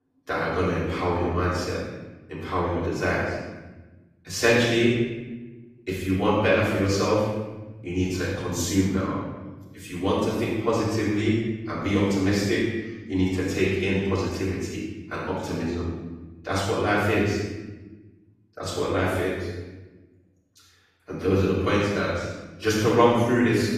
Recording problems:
room echo; strong; dies away in 1.1 s
off-mic speech; far
garbled, watery; slightly; nothing above 14.5 kHz

